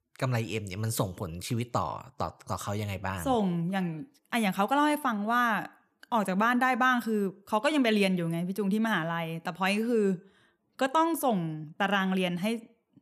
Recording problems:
none

